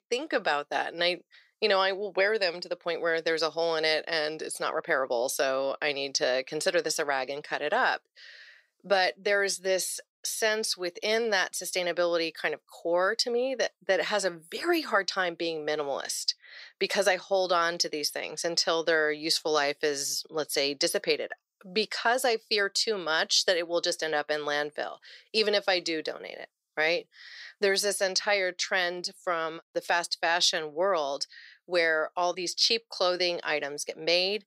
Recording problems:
thin; somewhat; fading below 300 Hz

